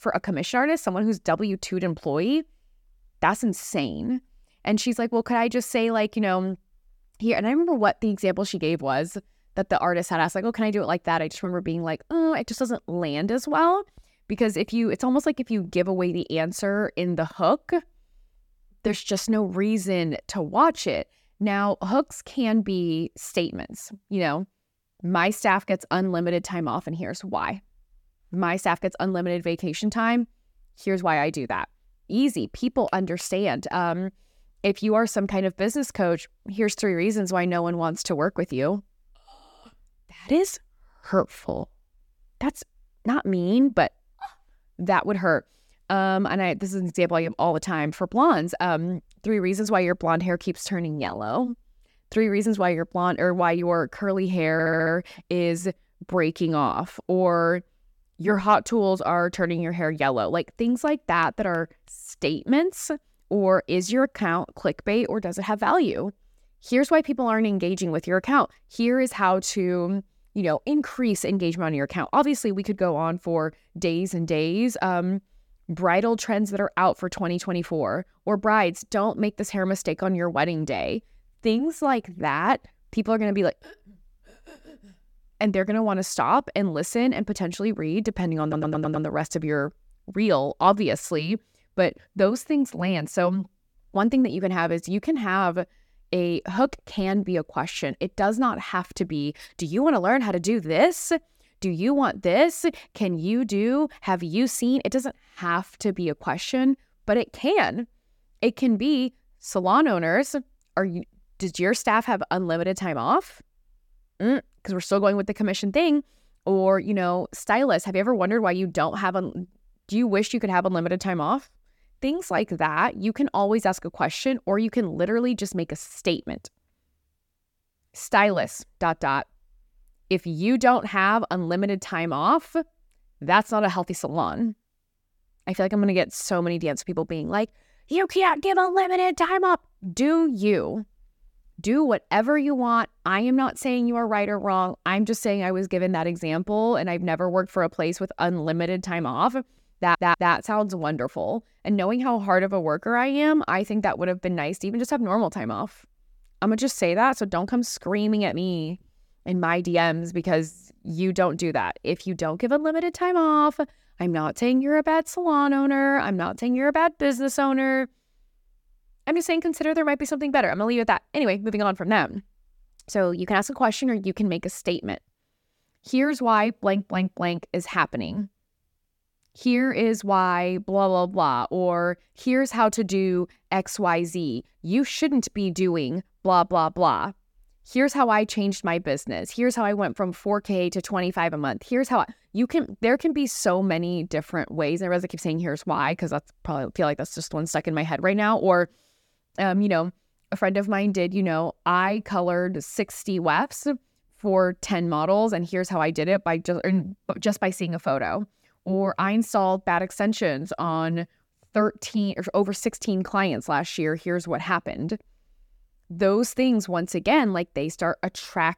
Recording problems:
audio stuttering; at 55 s, at 1:28 and at 2:30

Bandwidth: 17.5 kHz